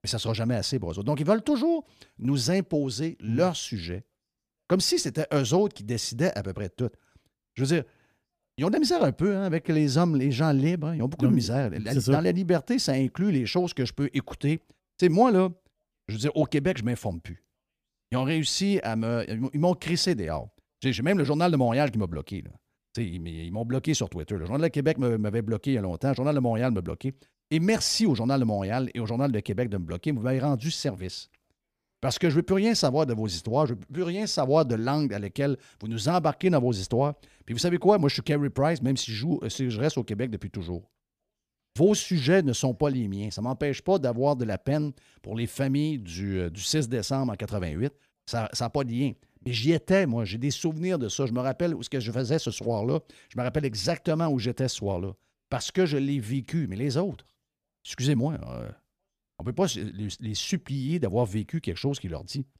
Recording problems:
none

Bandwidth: 15 kHz